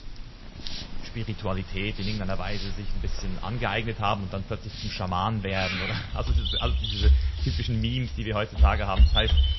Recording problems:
garbled, watery; slightly; nothing above 6 kHz
animal sounds; very loud; throughout; 3 dB above the speech
hiss; noticeable; throughout; 15 dB below the speech

